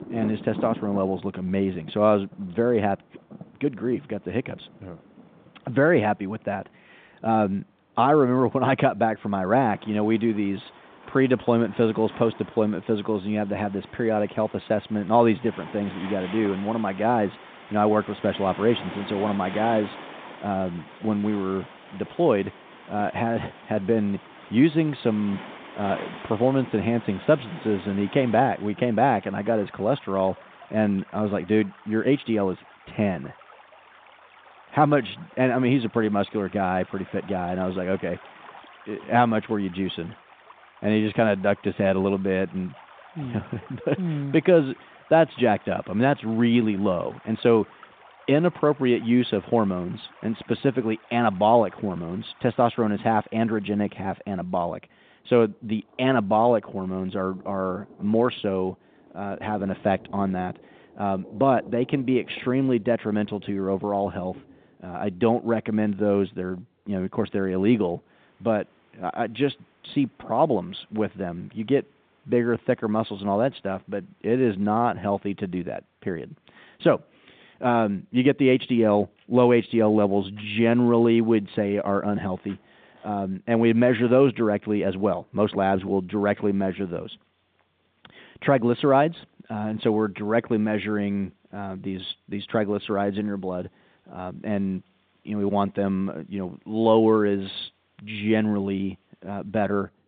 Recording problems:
phone-call audio; nothing above 3.5 kHz
rain or running water; noticeable; throughout; 20 dB below the speech

